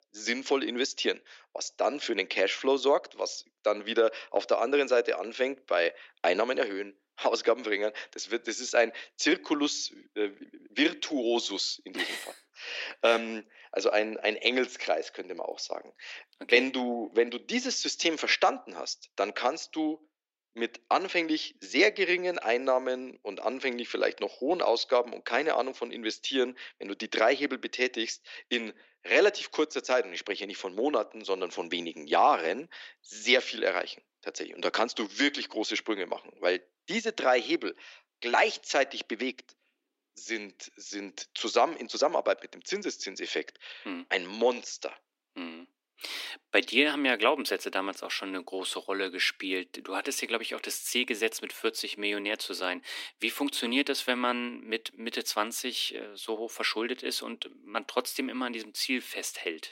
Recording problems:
thin; somewhat; fading below 300 Hz

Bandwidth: 16 kHz